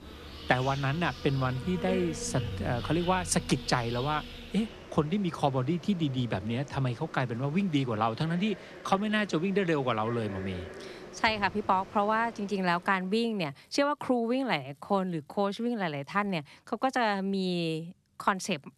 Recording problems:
animal sounds; noticeable; until 13 s; 15 dB below the speech
traffic noise; noticeable; throughout; 15 dB below the speech
uneven, jittery; slightly; from 1 to 15 s

